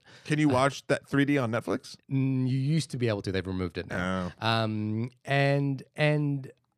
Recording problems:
uneven, jittery; strongly; from 0.5 to 6 s

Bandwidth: 14.5 kHz